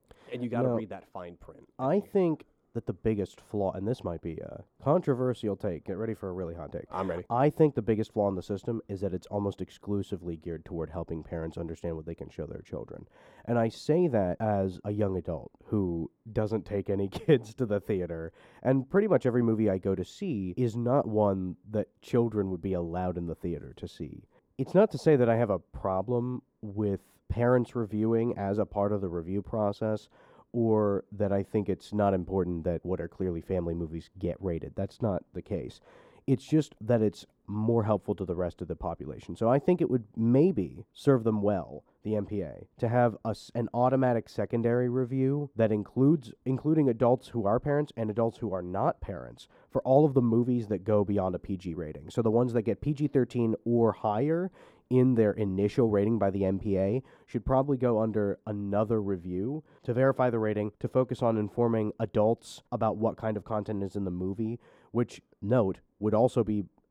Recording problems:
muffled; slightly; fading above 1.5 kHz

